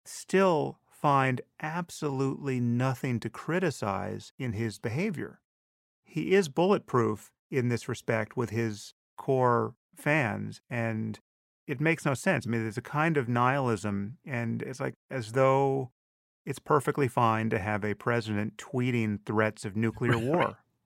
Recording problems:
none

